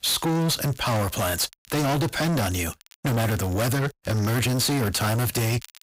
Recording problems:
distortion; heavy; 35% of the sound clipped
crackle, like an old record; faint; 25 dB below the speech

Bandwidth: 15.5 kHz